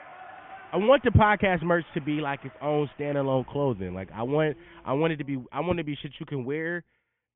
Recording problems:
high frequencies cut off; severe; nothing above 3.5 kHz
crowd noise; faint; until 5 s; 25 dB below the speech

